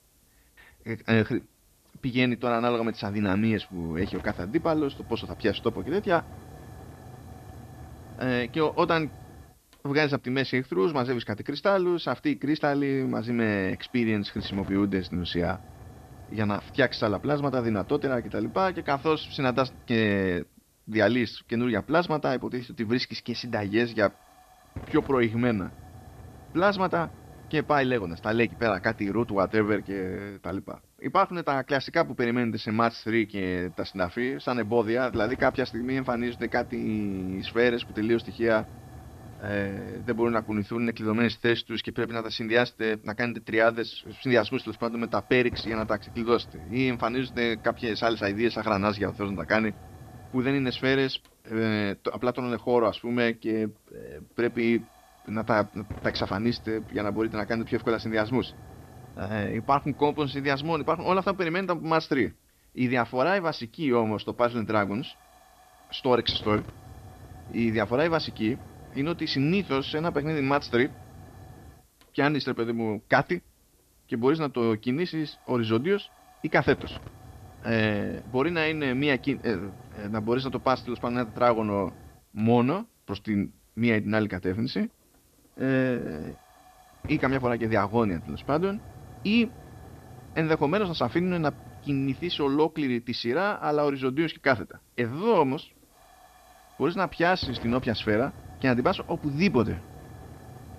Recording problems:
high frequencies cut off; noticeable; nothing above 5.5 kHz
hiss; noticeable; throughout; 20 dB below the speech

